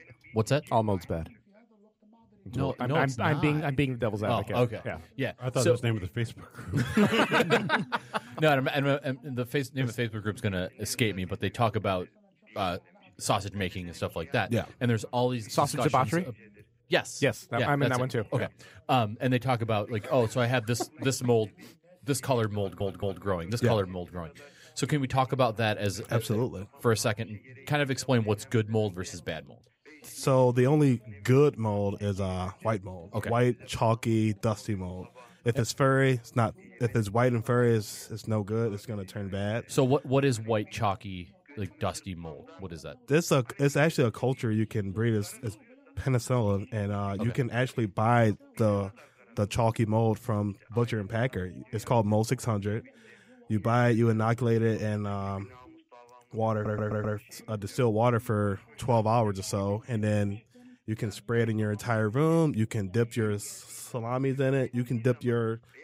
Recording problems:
background chatter; faint; throughout; 2 voices, 25 dB below the speech
audio stuttering; at 23 s and at 57 s

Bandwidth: 15.5 kHz